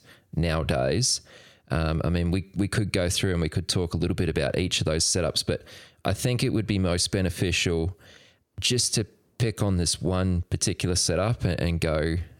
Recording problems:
squashed, flat; somewhat

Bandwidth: 18 kHz